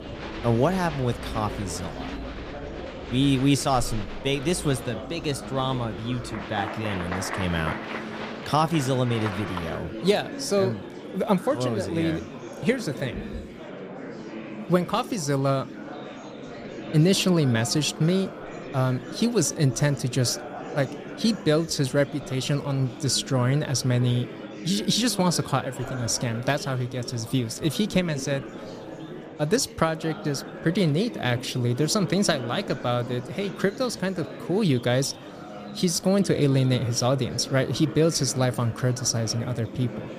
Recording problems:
murmuring crowd; noticeable; throughout; 10 dB below the speech

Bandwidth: 14.5 kHz